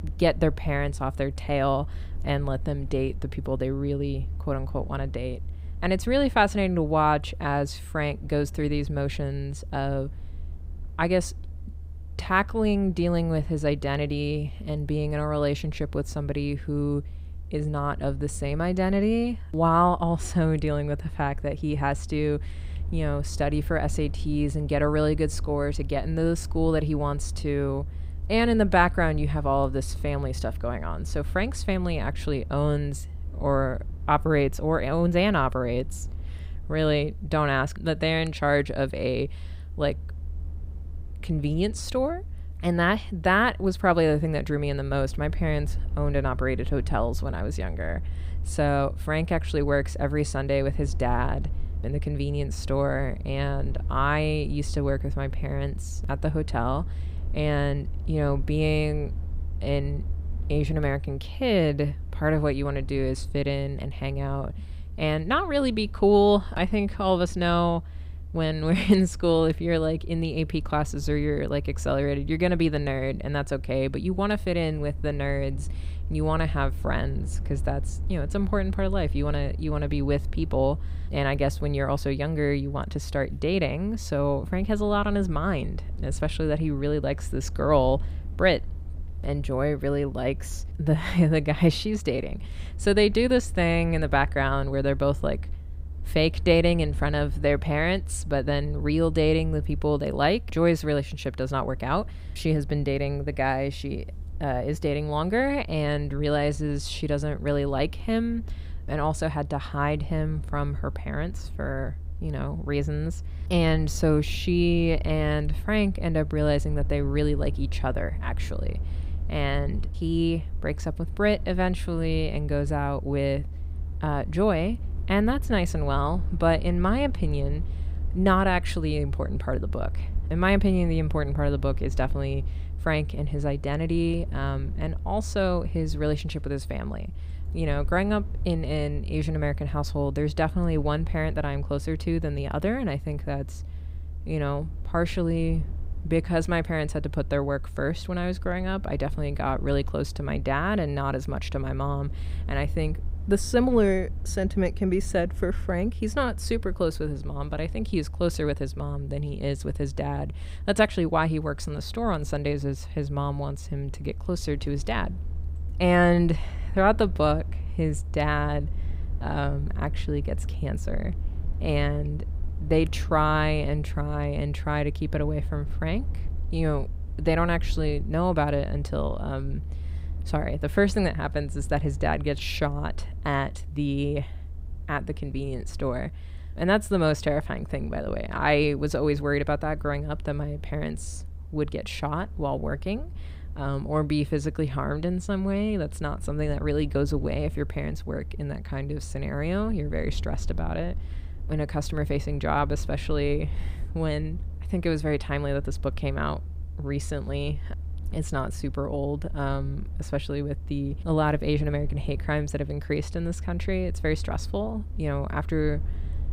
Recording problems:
low rumble; faint; throughout; 25 dB below the speech

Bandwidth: 15.5 kHz